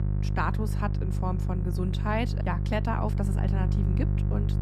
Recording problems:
electrical hum; loud; throughout; 50 Hz, 7 dB below the speech

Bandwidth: 13.5 kHz